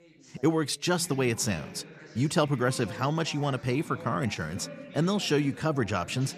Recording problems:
background chatter; noticeable; throughout; 3 voices, 15 dB below the speech

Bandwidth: 14.5 kHz